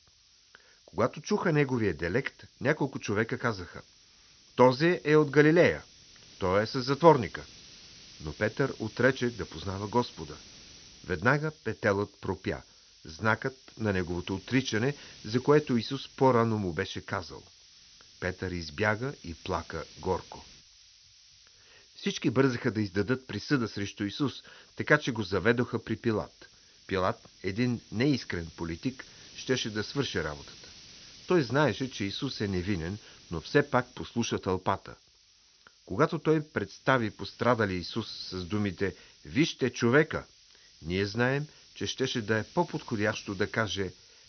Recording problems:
high frequencies cut off; noticeable; nothing above 6 kHz
hiss; faint; throughout; 20 dB below the speech

